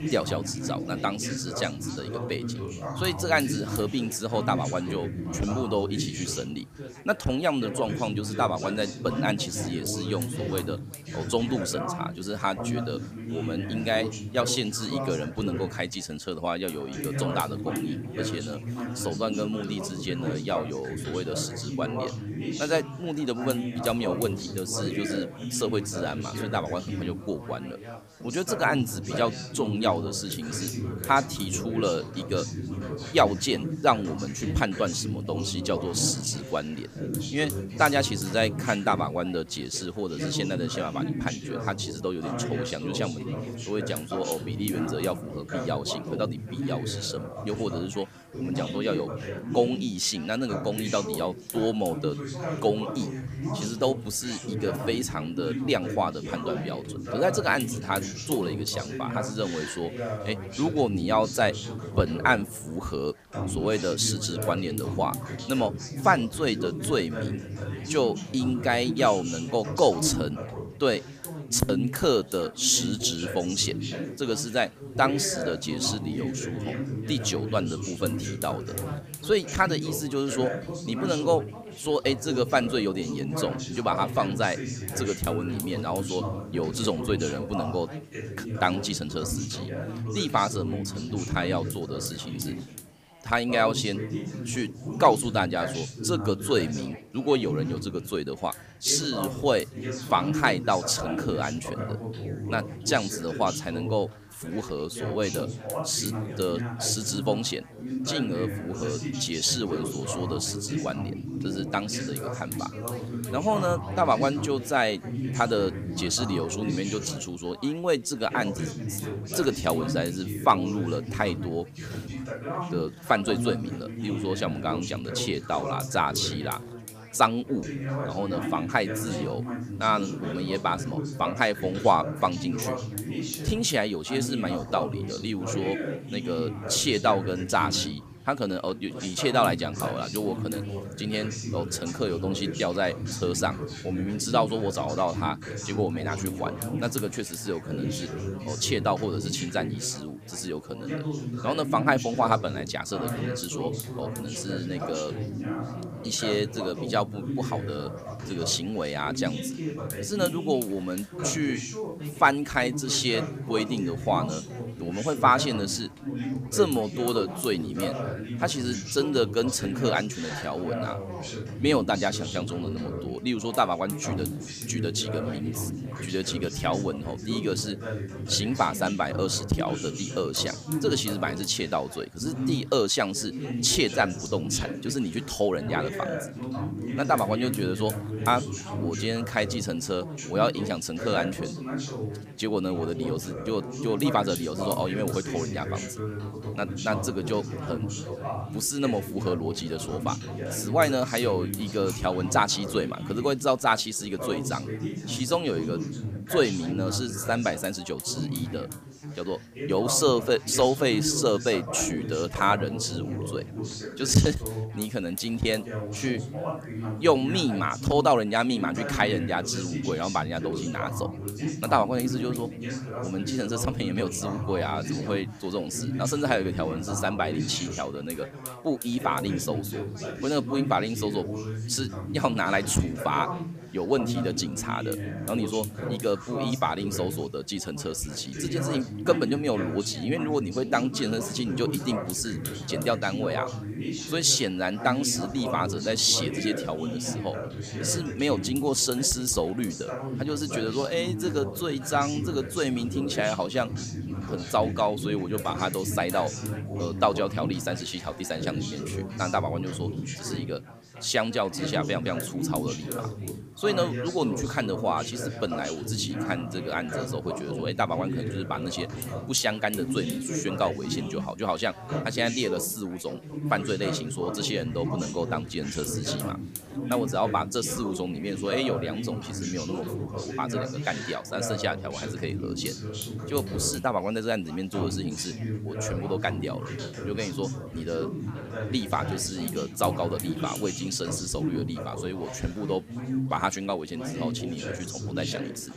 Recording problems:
background chatter; loud; throughout; 4 voices, 6 dB below the speech
hiss; noticeable; throughout; 15 dB below the speech

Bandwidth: 15 kHz